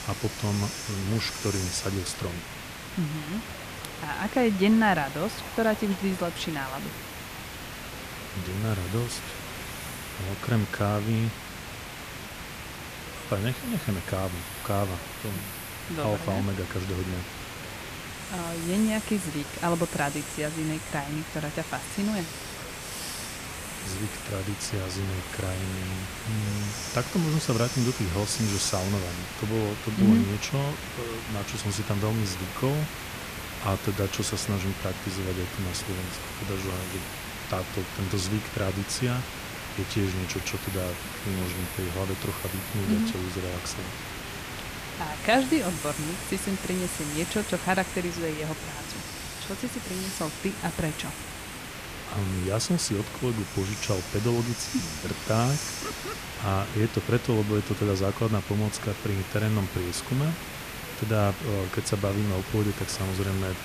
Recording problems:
hiss; loud; throughout; 6 dB below the speech
traffic noise; faint; throughout; 30 dB below the speech
murmuring crowd; faint; throughout; 20 dB below the speech

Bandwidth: 14.5 kHz